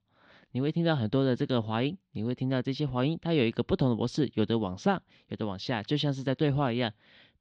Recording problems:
muffled; very slightly; fading above 4.5 kHz

